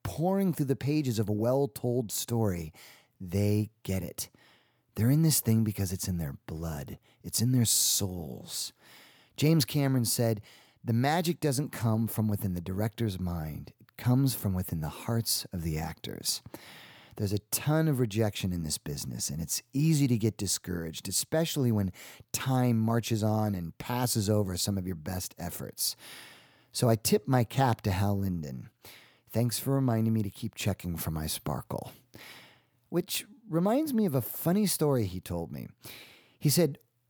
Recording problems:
none

